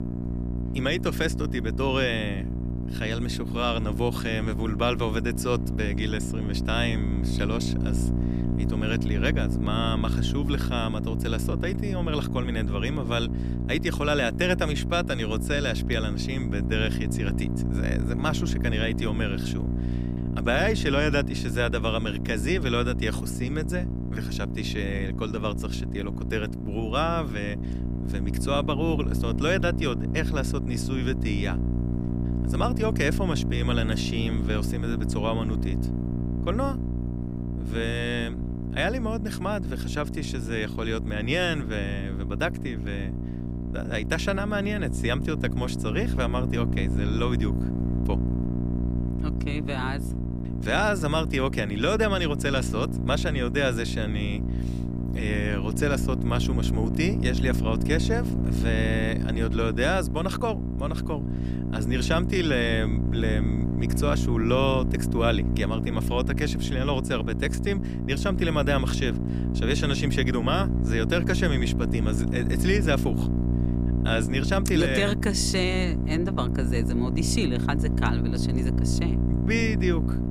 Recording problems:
electrical hum; loud; throughout; 60 Hz, 8 dB below the speech

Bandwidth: 15 kHz